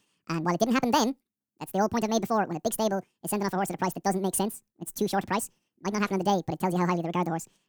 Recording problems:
wrong speed and pitch; too fast and too high; 1.7 times normal speed

